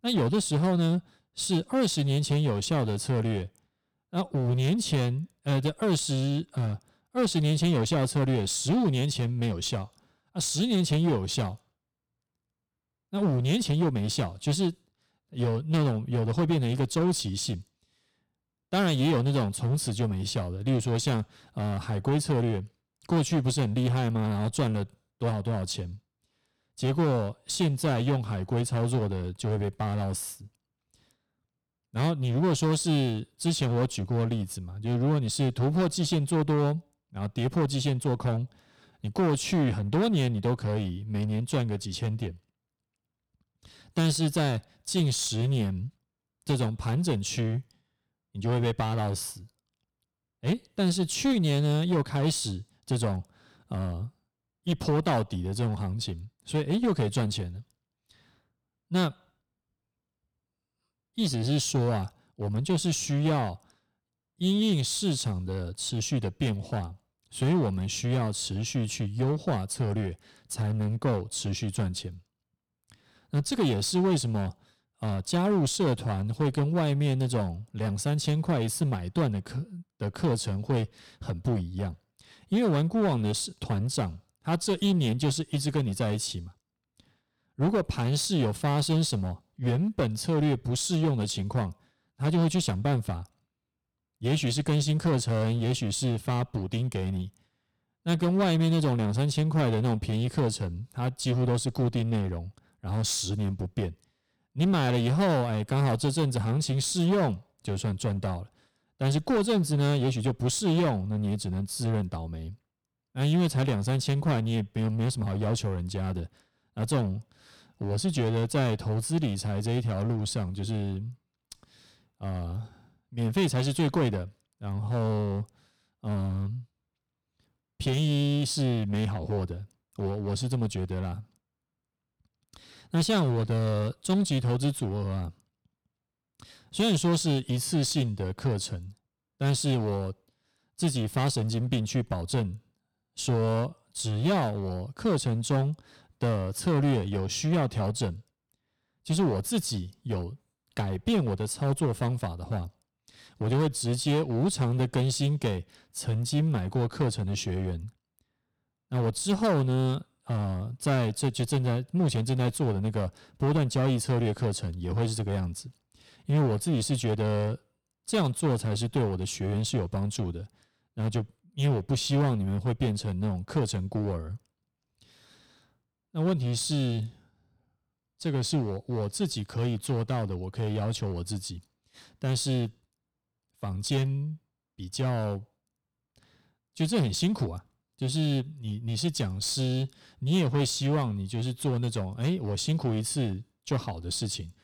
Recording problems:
distortion; slight; 11% of the sound clipped

